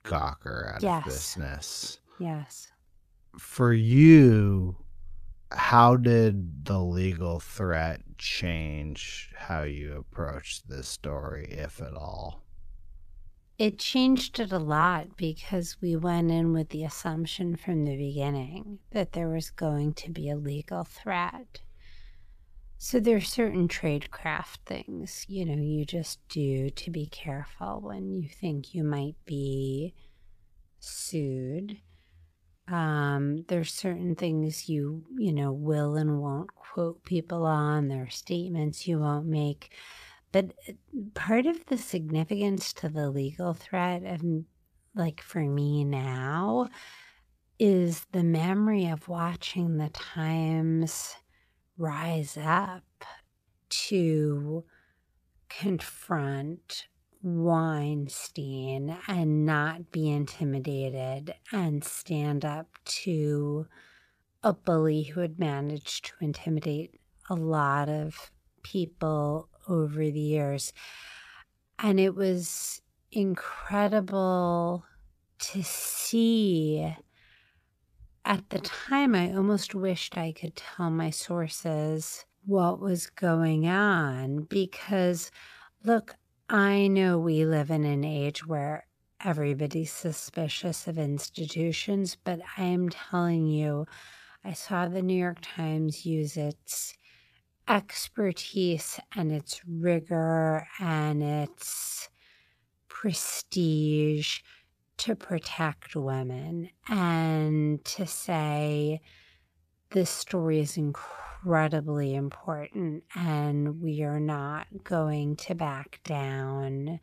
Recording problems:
wrong speed, natural pitch; too slow; 0.6 times normal speed

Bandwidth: 14.5 kHz